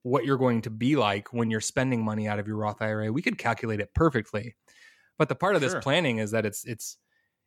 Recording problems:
none

